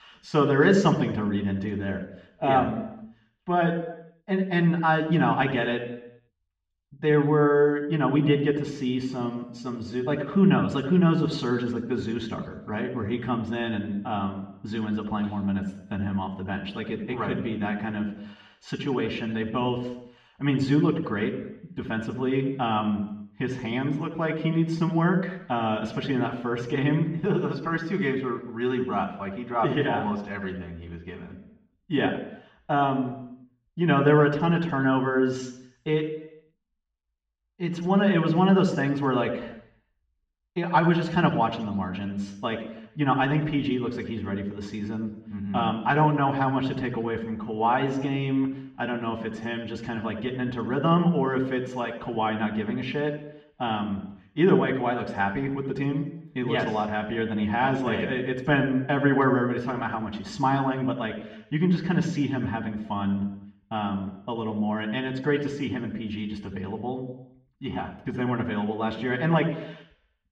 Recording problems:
muffled; slightly; fading above 3 kHz
room echo; slight; dies away in 0.7 s
off-mic speech; somewhat distant

